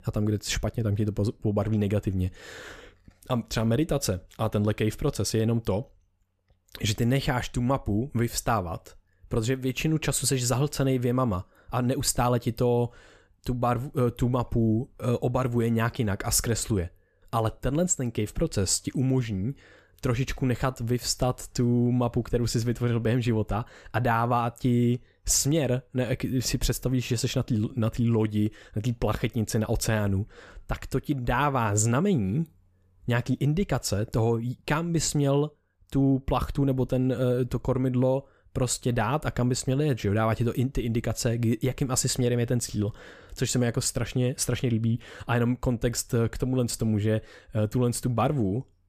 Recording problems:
none

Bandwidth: 14.5 kHz